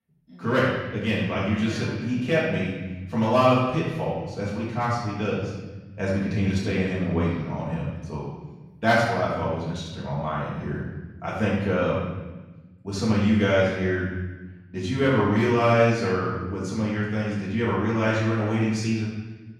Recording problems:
off-mic speech; far
room echo; noticeable; dies away in 1.2 s

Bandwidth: 17 kHz